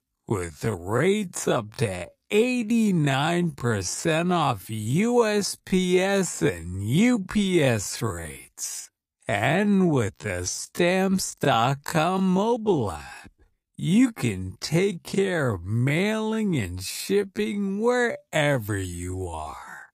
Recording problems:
wrong speed, natural pitch; too slow; 0.5 times normal speed

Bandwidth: 15 kHz